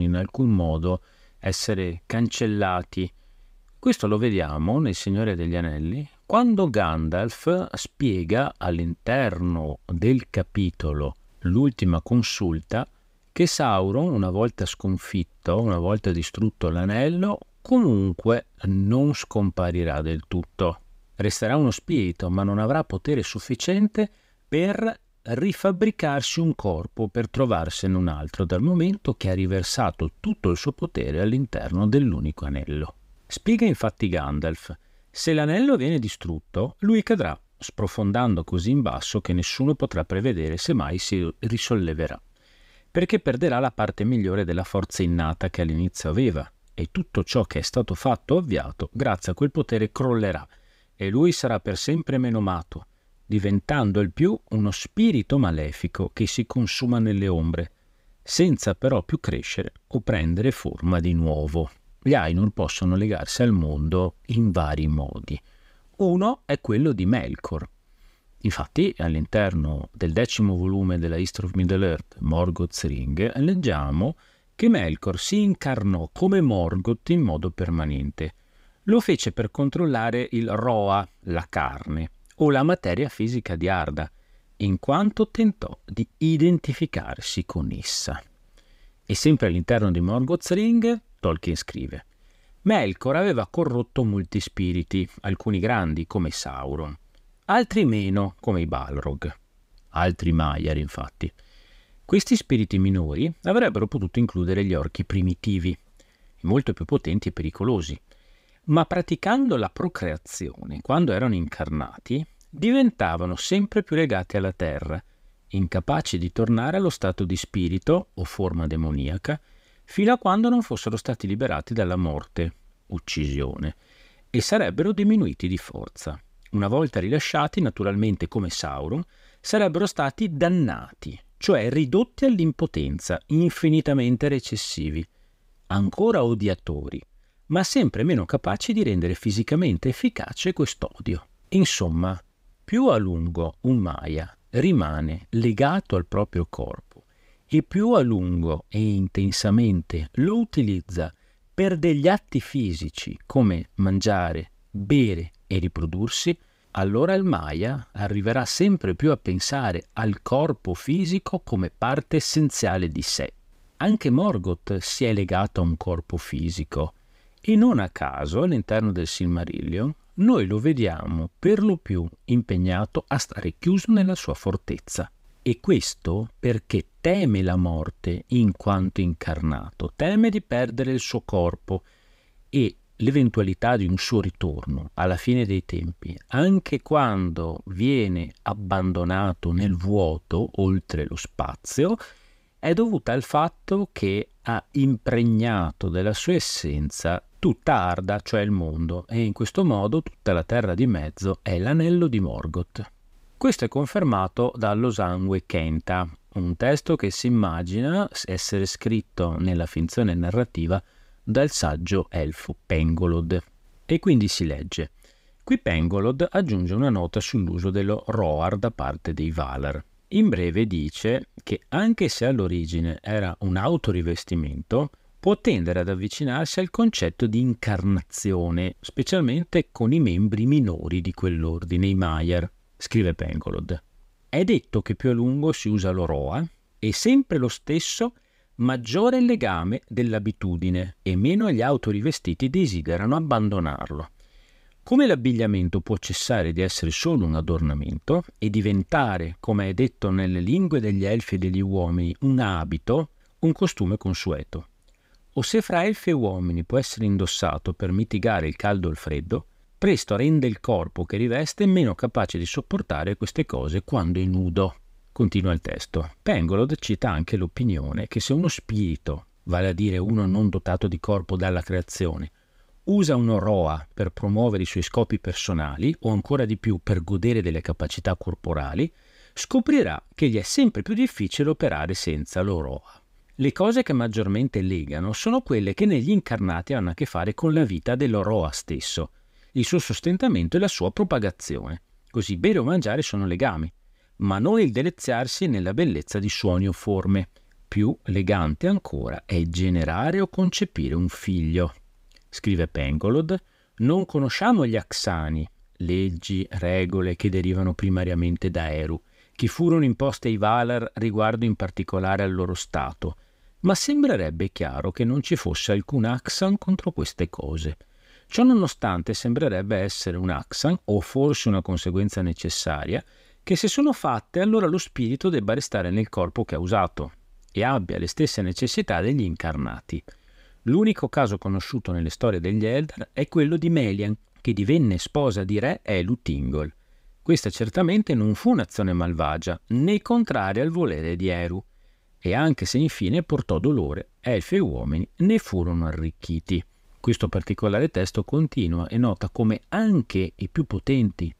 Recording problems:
abrupt cut into speech; at the start

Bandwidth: 15.5 kHz